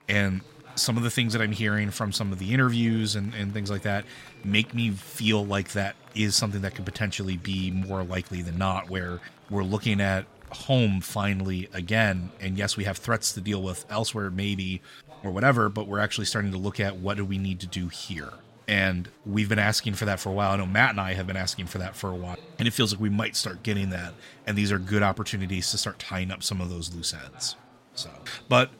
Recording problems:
chatter from many people; faint; throughout; 25 dB below the speech

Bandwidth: 16 kHz